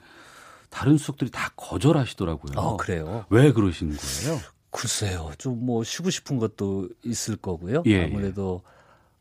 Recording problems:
none

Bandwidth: 15 kHz